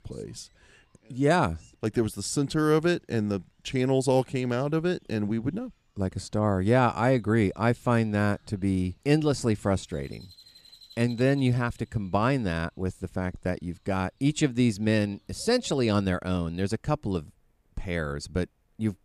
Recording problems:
animal sounds; faint; throughout; 30 dB below the speech

